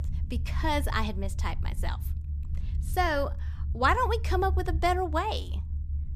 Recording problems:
low rumble; faint; throughout; 20 dB below the speech

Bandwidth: 14.5 kHz